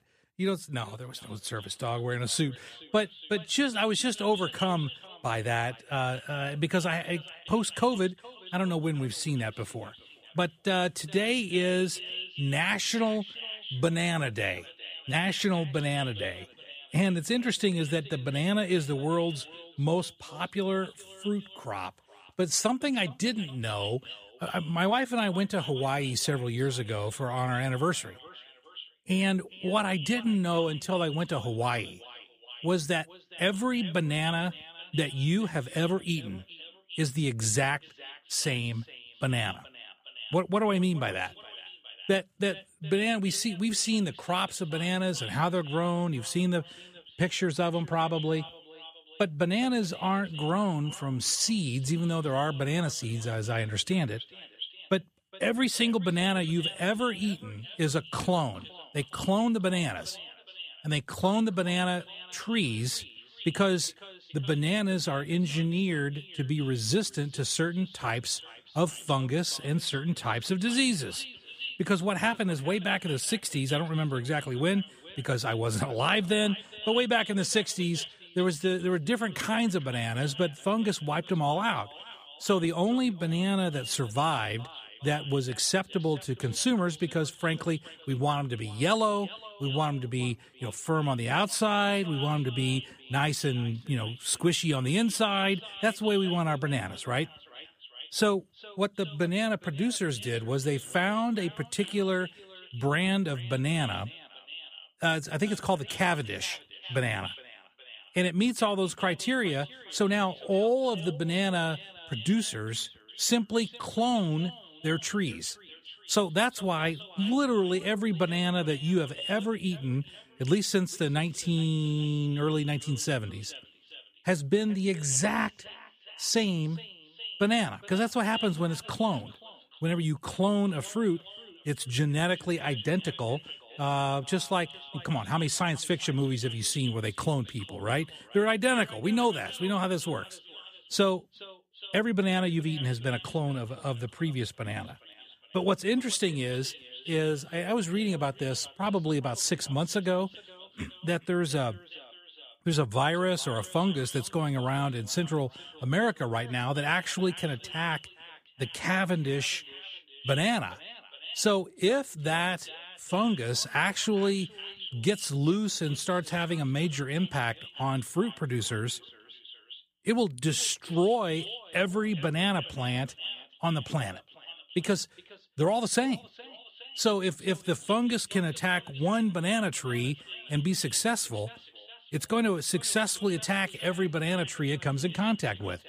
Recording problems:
echo of what is said; noticeable; throughout; 410 ms later, 15 dB below the speech

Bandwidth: 15 kHz